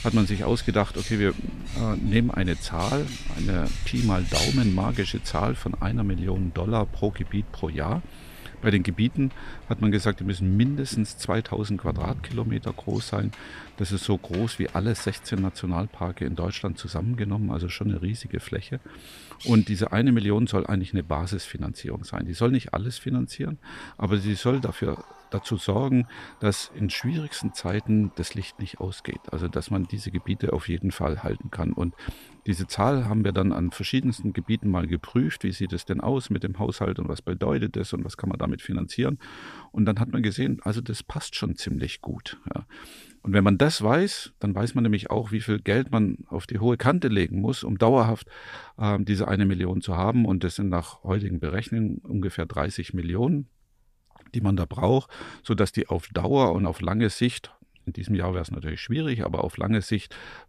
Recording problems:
animal sounds; noticeable; throughout; 15 dB below the speech

